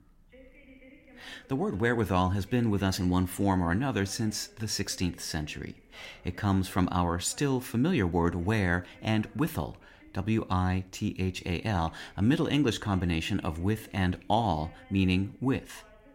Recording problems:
voice in the background; faint; throughout; 25 dB below the speech

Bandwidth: 16 kHz